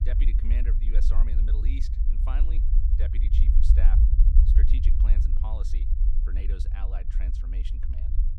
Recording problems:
low rumble; loud; throughout; as loud as the speech

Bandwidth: 15 kHz